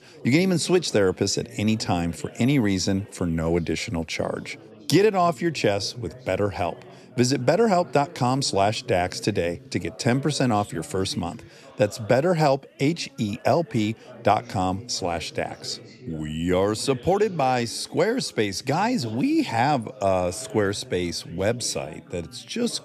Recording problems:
background chatter; faint; throughout; 3 voices, 20 dB below the speech

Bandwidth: 13.5 kHz